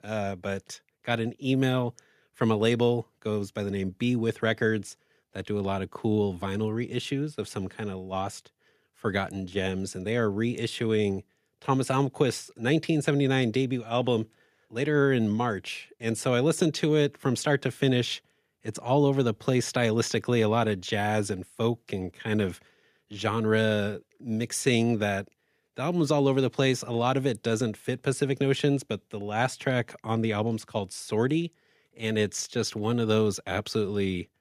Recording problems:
none

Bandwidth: 14.5 kHz